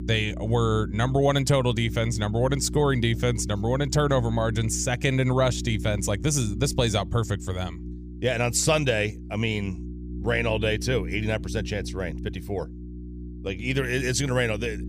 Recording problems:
electrical hum; noticeable; throughout; 60 Hz, 15 dB below the speech

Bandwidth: 15 kHz